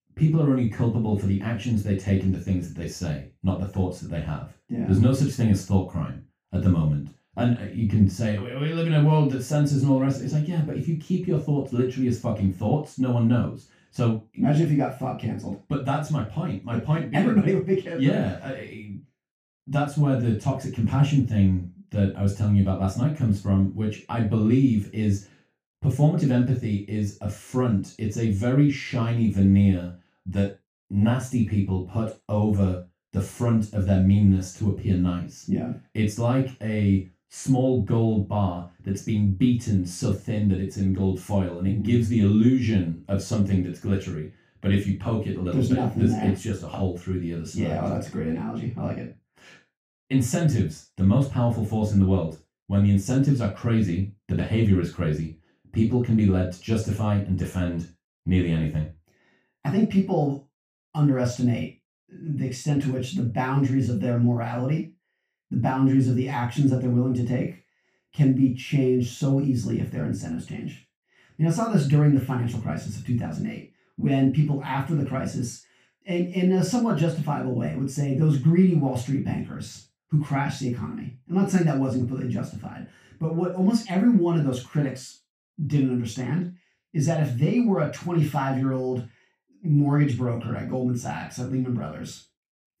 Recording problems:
off-mic speech; far
room echo; noticeable; dies away in 0.3 s

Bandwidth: 15 kHz